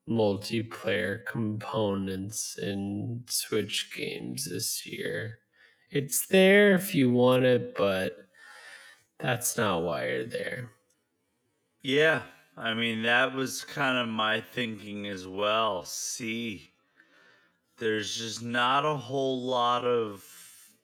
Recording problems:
wrong speed, natural pitch; too slow; 0.5 times normal speed

